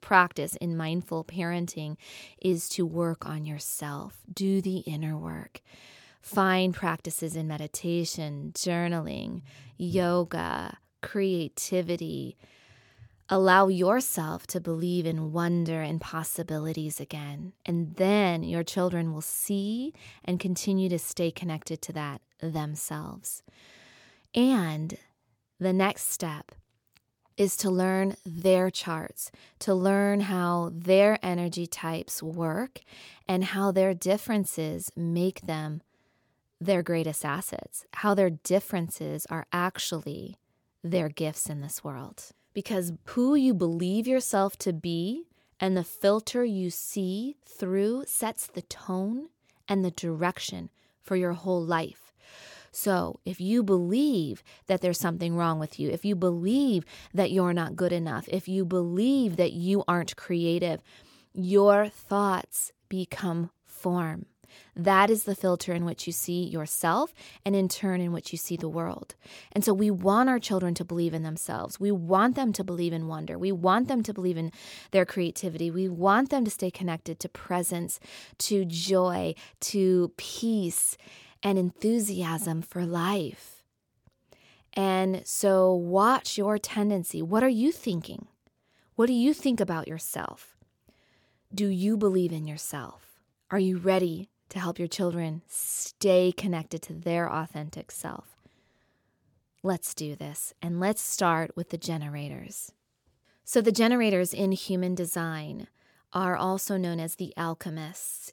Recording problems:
none

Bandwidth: 17.5 kHz